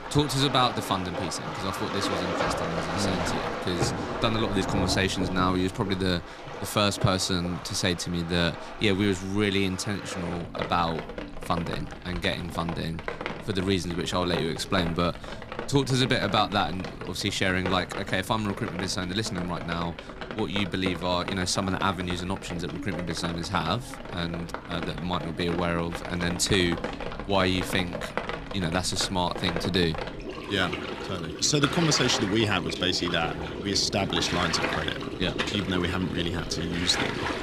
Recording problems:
rain or running water; loud; throughout; 6 dB below the speech

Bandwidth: 14.5 kHz